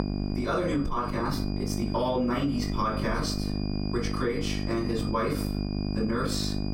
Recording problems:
off-mic speech; far
room echo; slight; dies away in 0.3 s
squashed, flat; somewhat
electrical hum; loud; throughout; 50 Hz, 9 dB below the speech
high-pitched whine; noticeable; throughout; 5 kHz, 15 dB below the speech

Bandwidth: 16 kHz